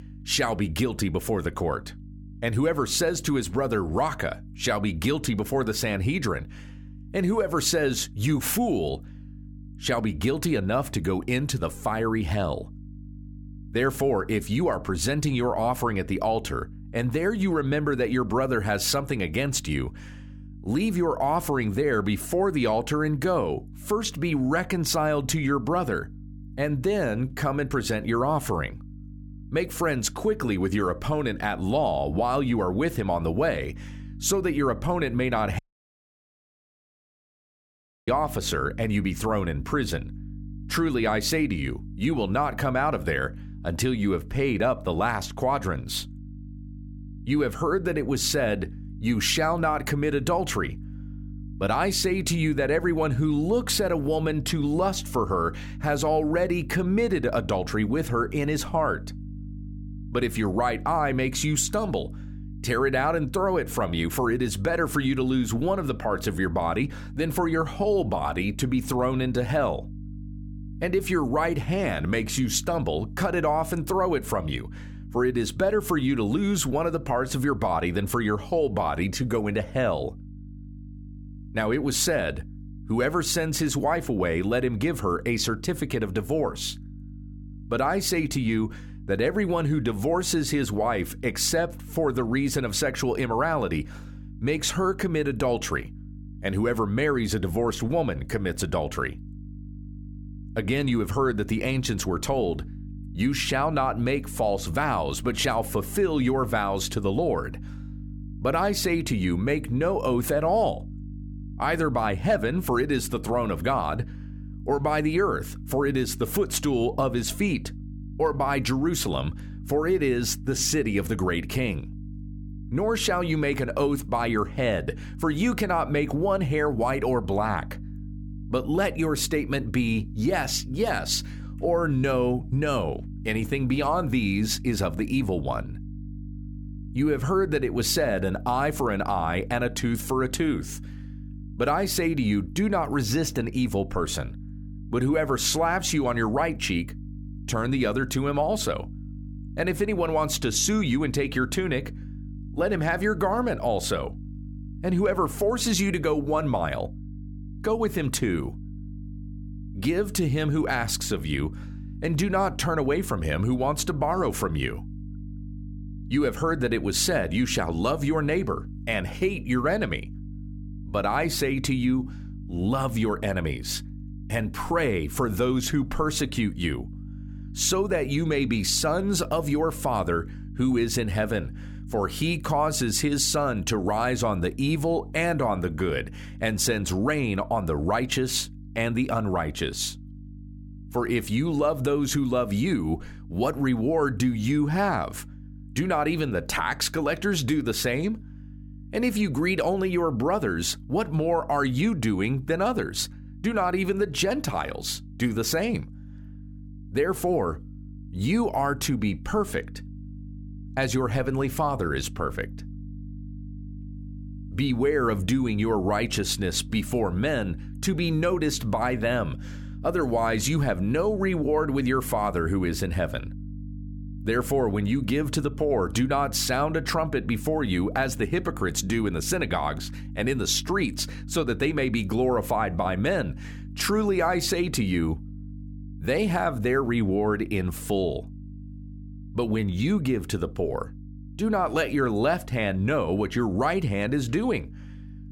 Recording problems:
electrical hum; faint; throughout; 50 Hz, 25 dB below the speech
audio cutting out; at 36 s for 2.5 s

